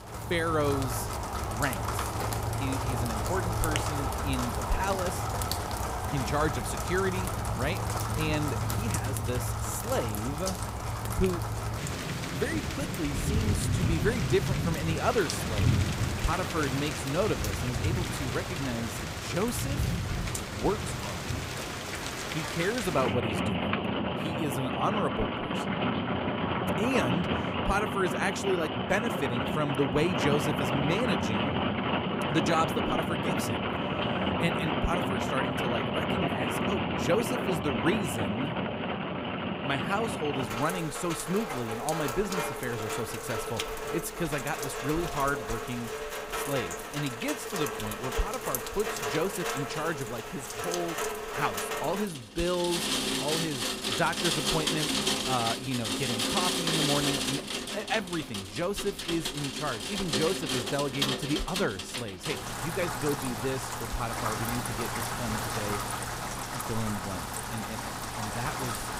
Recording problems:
rain or running water; very loud; throughout; 2 dB above the speech

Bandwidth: 15.5 kHz